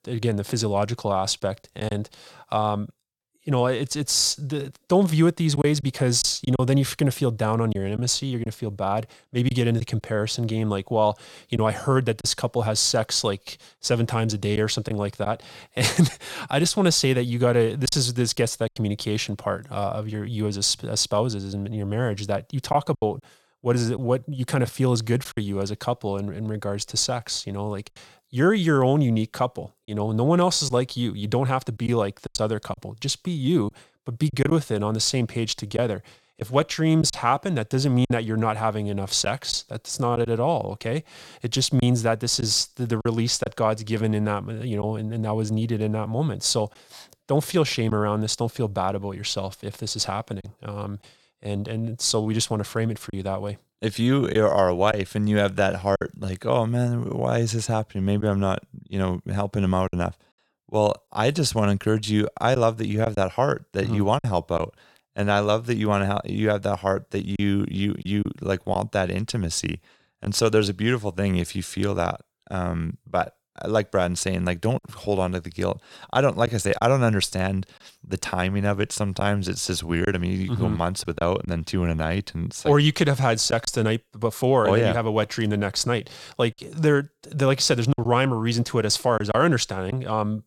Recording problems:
choppy; occasionally; 2% of the speech affected

